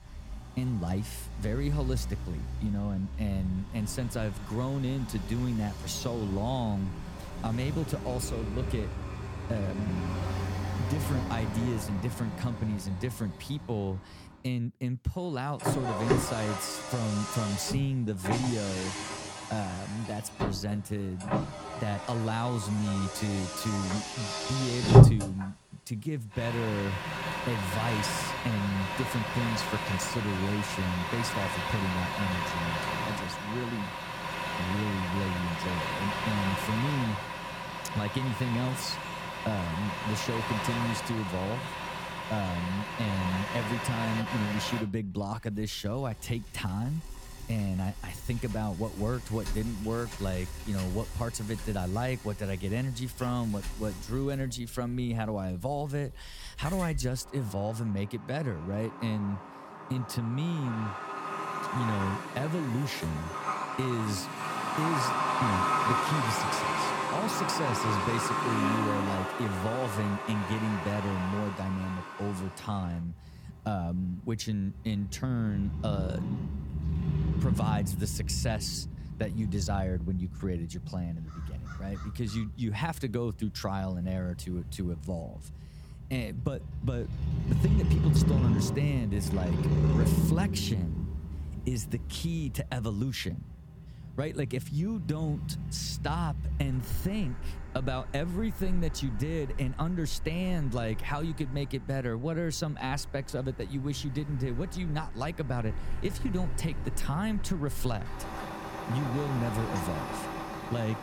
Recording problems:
traffic noise; very loud; throughout; as loud as the speech

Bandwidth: 17 kHz